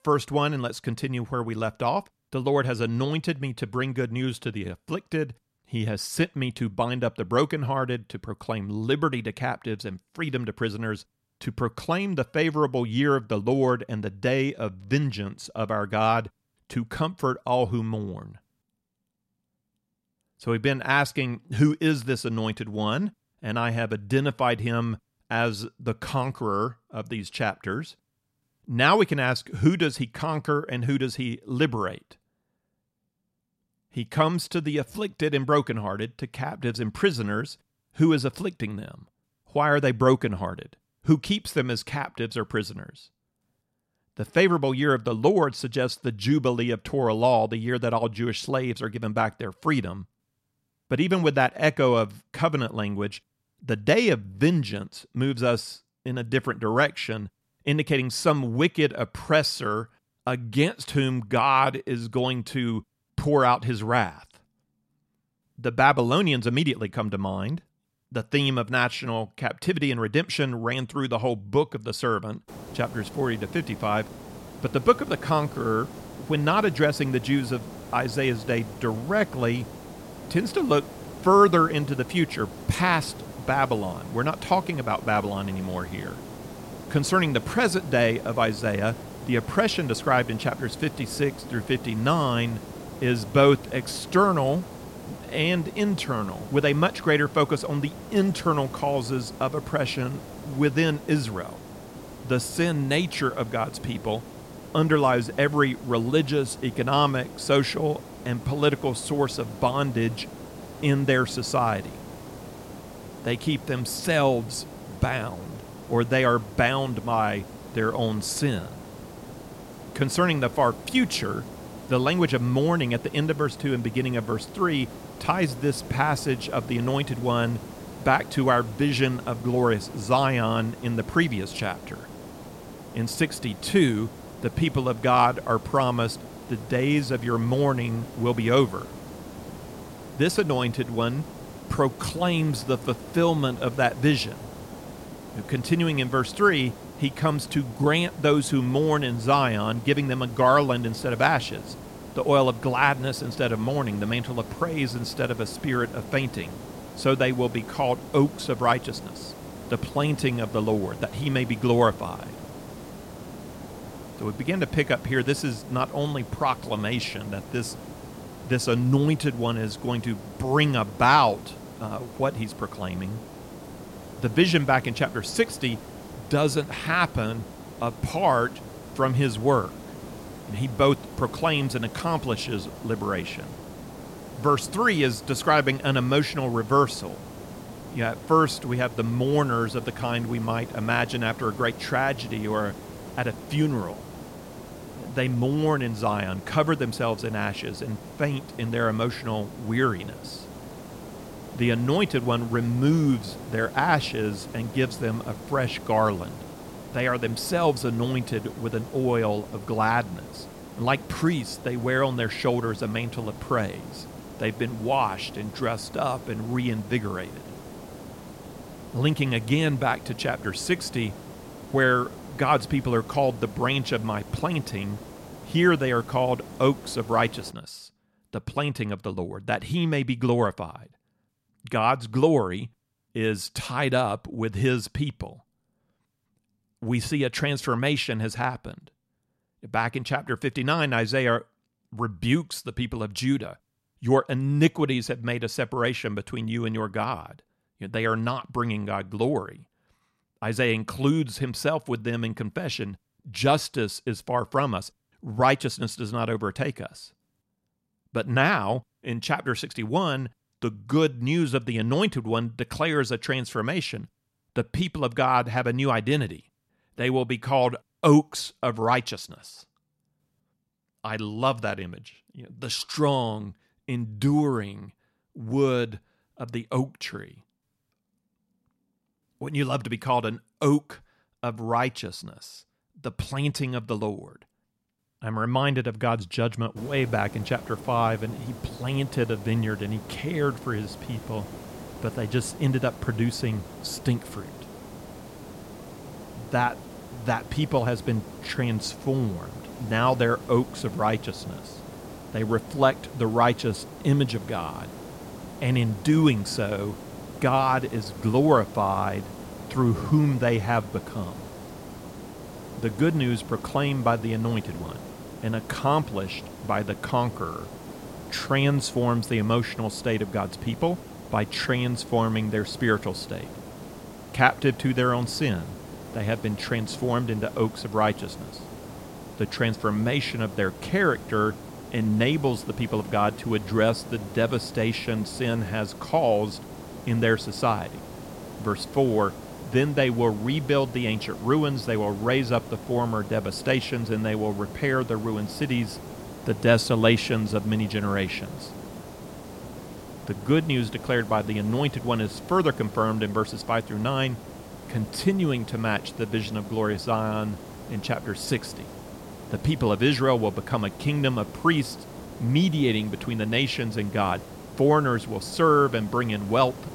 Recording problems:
hiss; noticeable; from 1:12 to 3:48 and from 4:47 on; 15 dB below the speech

